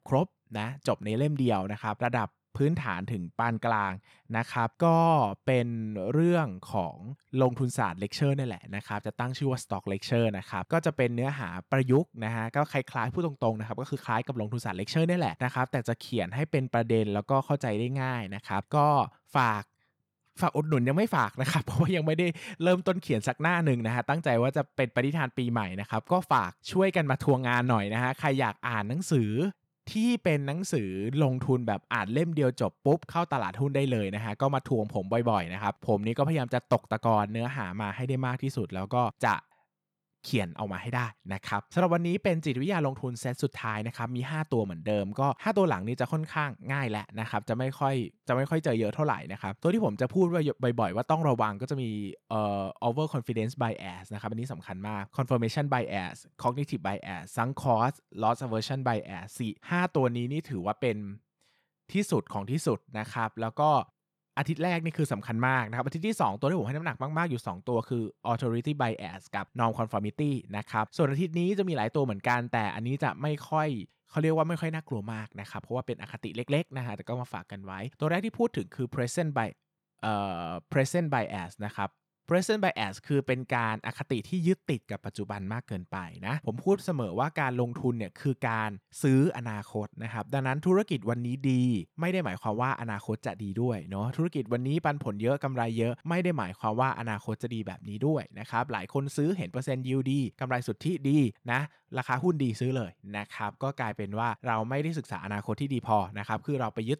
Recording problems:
none

